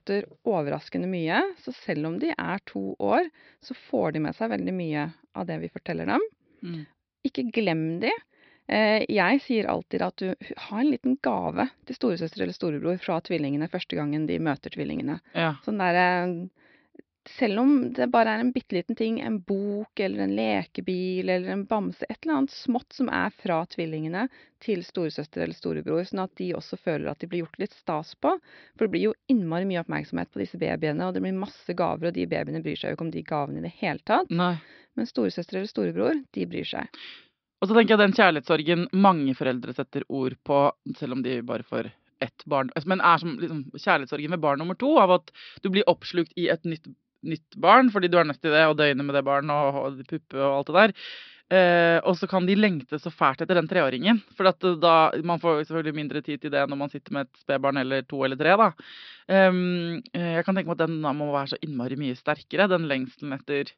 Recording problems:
high frequencies cut off; noticeable; nothing above 5.5 kHz

